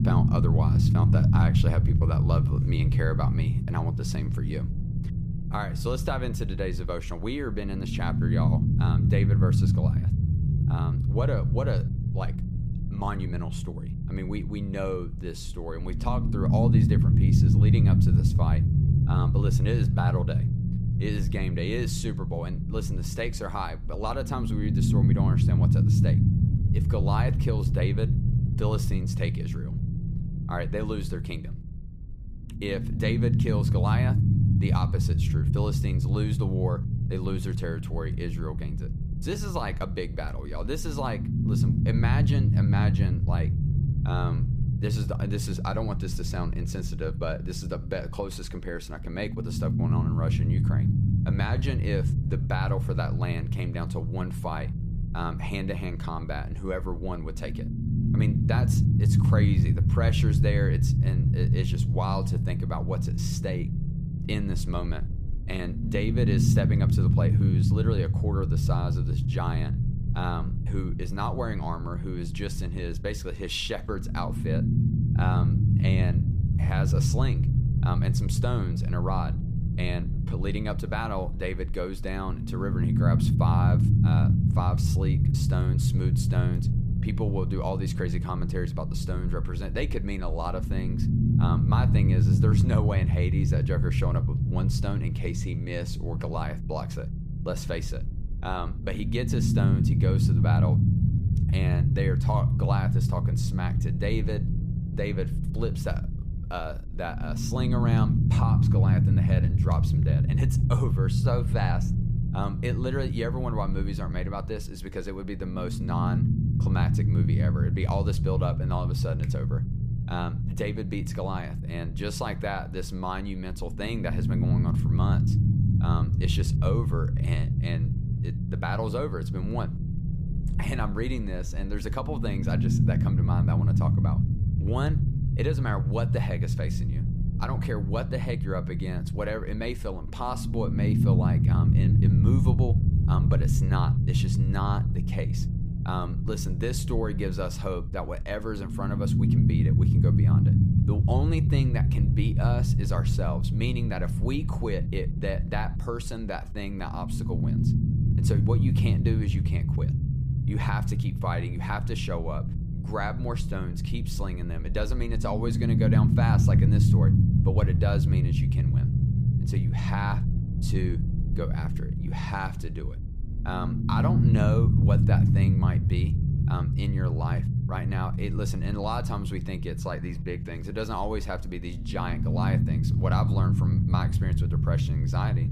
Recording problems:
low rumble; loud; throughout; 2 dB below the speech

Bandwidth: 15 kHz